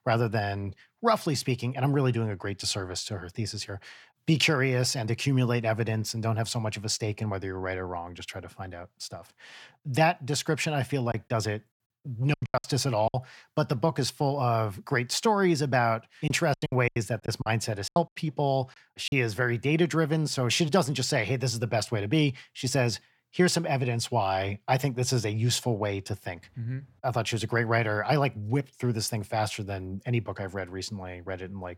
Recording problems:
choppy; very; from 11 to 13 s and from 16 to 19 s; 16% of the speech affected

